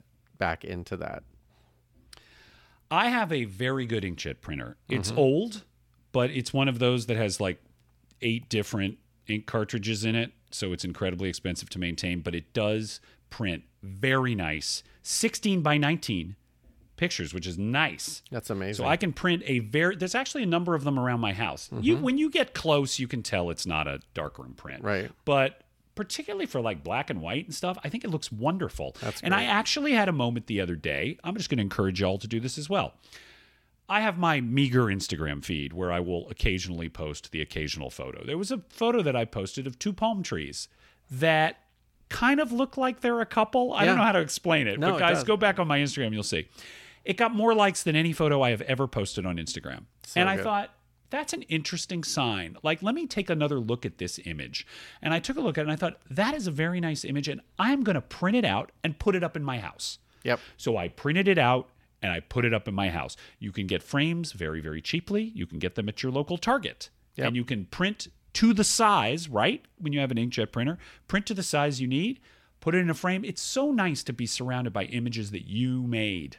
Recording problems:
none

